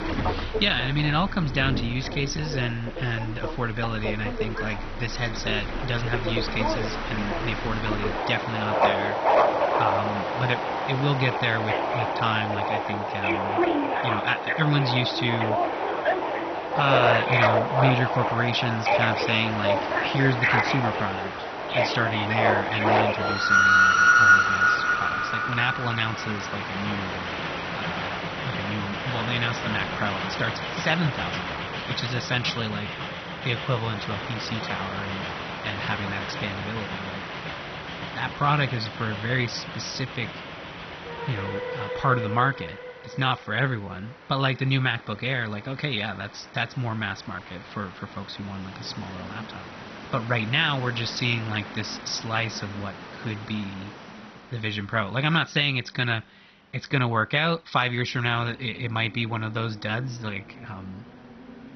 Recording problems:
garbled, watery; badly; nothing above 6 kHz
train or aircraft noise; very loud; throughout; 1 dB above the speech

